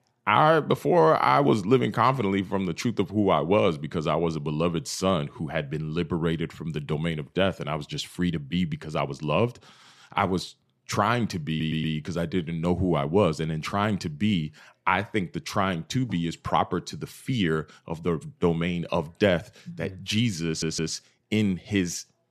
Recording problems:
audio stuttering; at 11 s and at 20 s

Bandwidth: 14 kHz